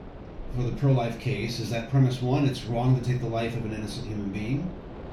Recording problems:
off-mic speech; far
room echo; noticeable; dies away in 0.3 s
wind noise on the microphone; occasional gusts; 15 dB below the speech

